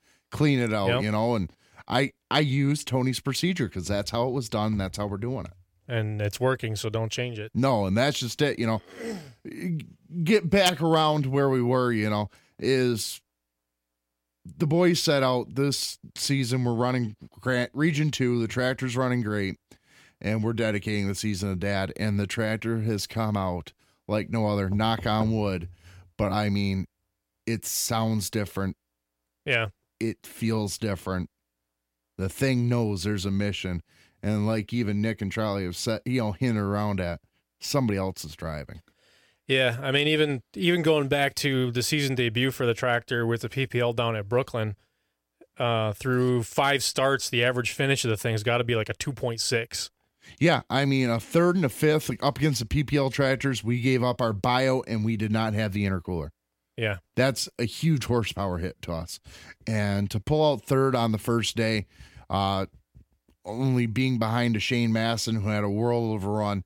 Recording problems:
none

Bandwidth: 17.5 kHz